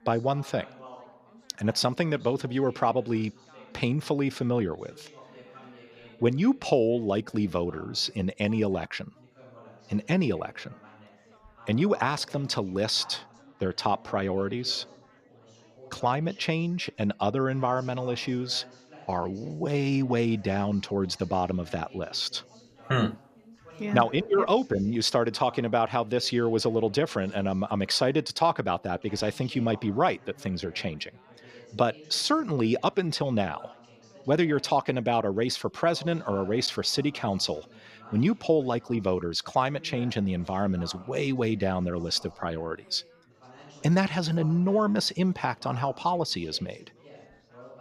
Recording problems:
chatter from many people; faint; throughout; 25 dB below the speech

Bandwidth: 14.5 kHz